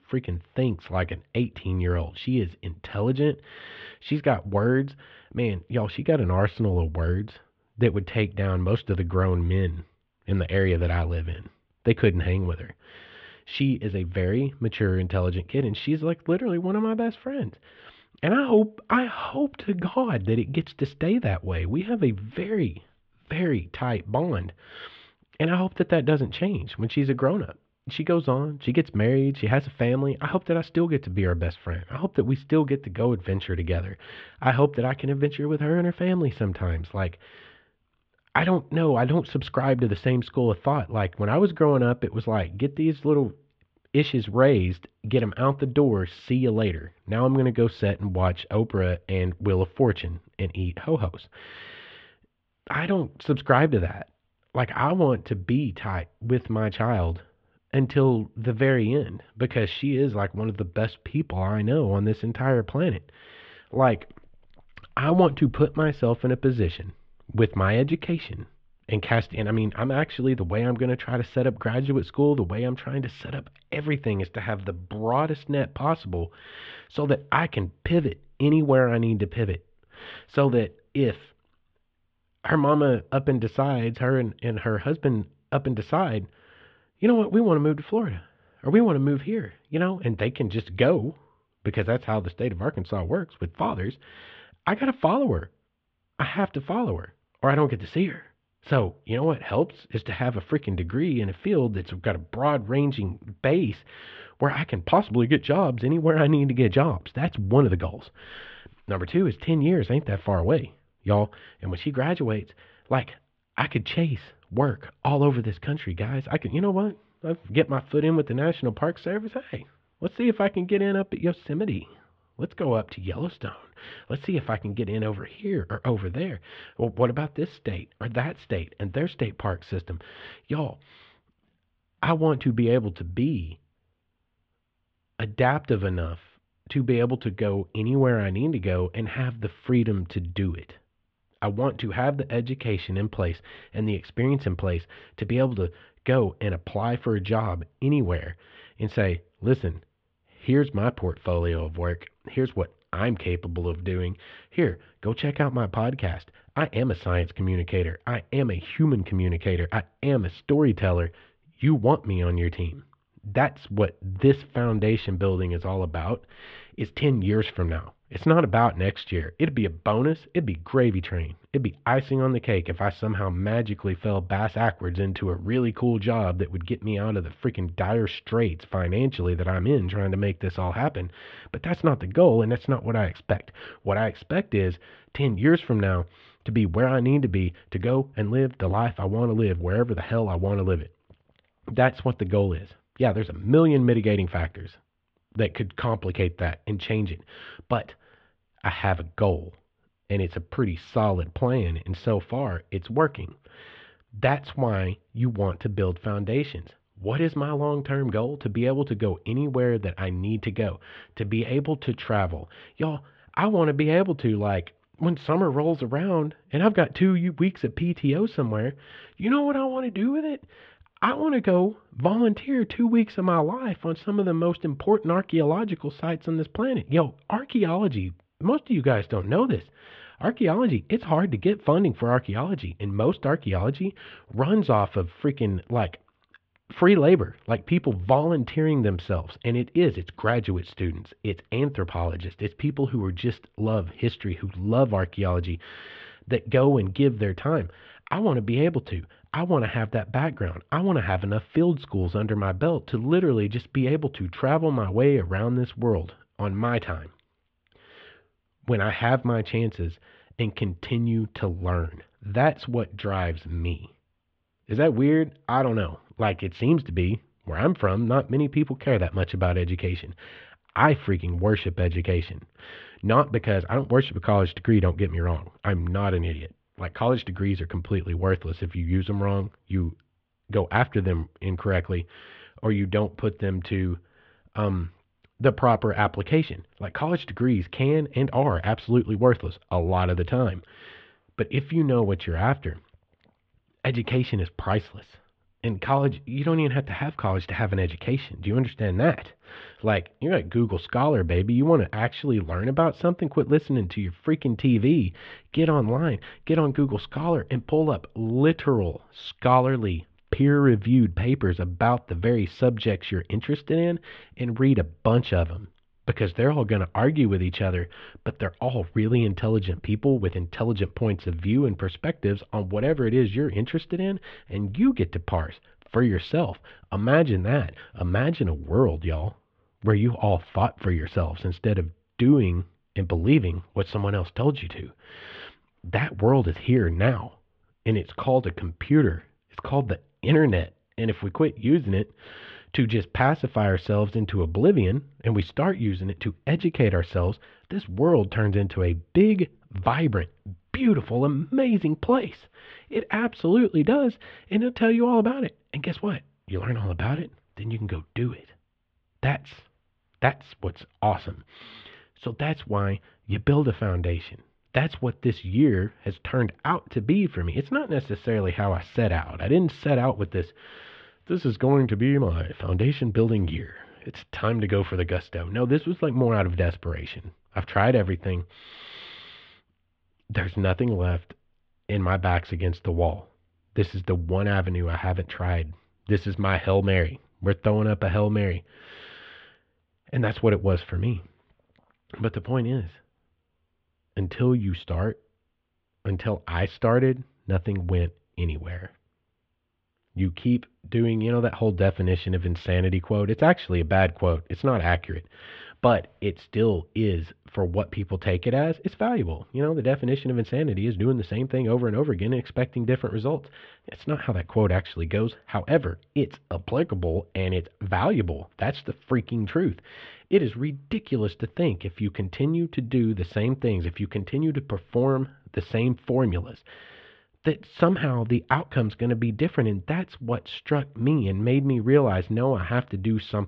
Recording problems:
muffled; very; fading above 3.5 kHz

